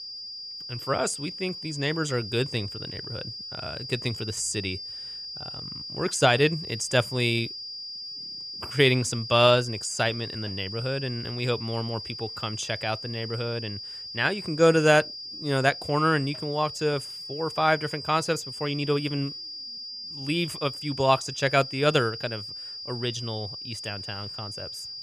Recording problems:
high-pitched whine; loud; throughout; 5 kHz, 9 dB below the speech

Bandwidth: 14.5 kHz